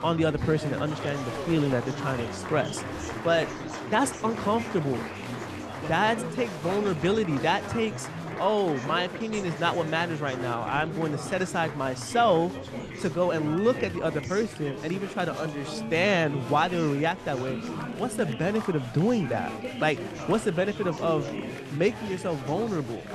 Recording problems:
chatter from many people; loud; throughout; 8 dB below the speech

